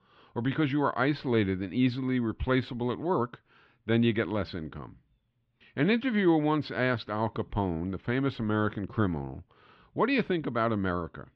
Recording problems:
muffled; slightly; fading above 3 kHz

